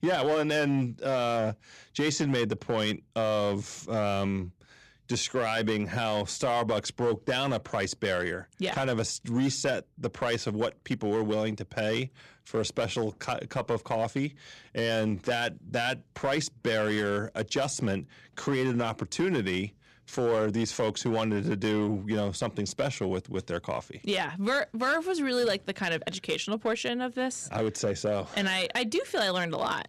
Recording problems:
distortion; slight; 5% of the sound clipped

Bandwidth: 13.5 kHz